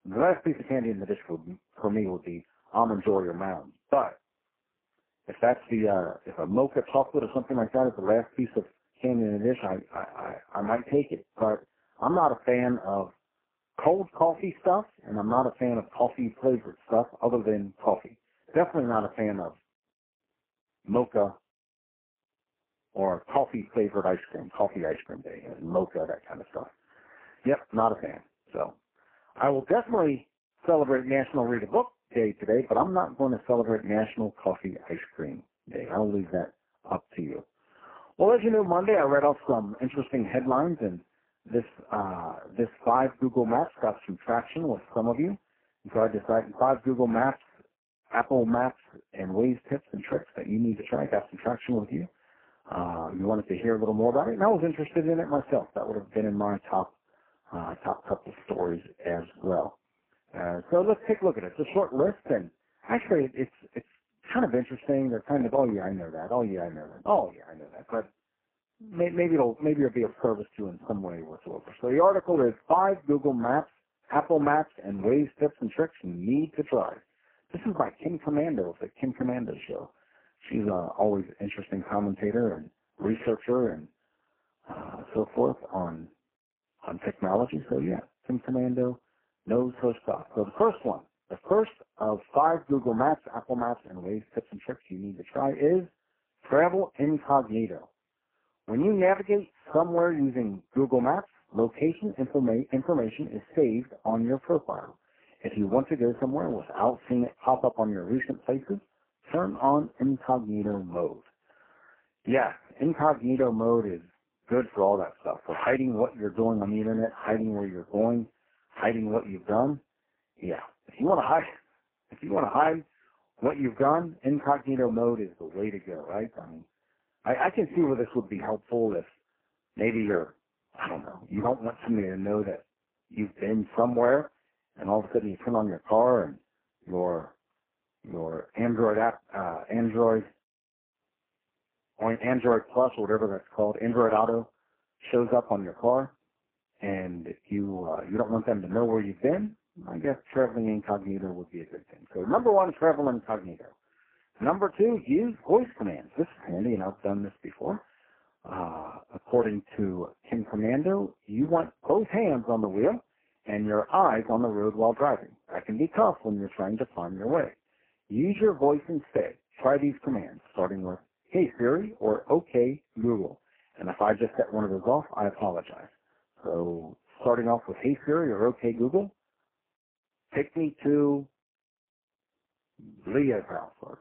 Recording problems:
phone-call audio; poor line
garbled, watery; badly

